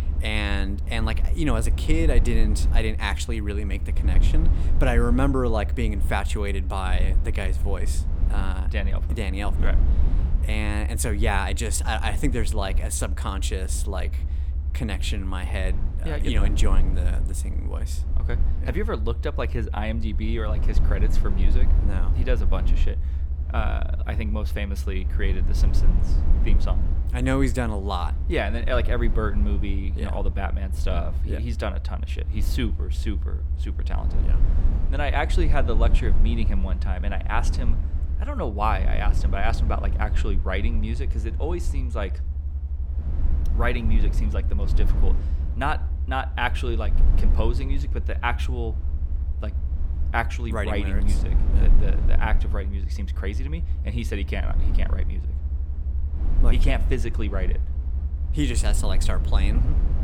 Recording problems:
low rumble; noticeable; throughout; 15 dB below the speech

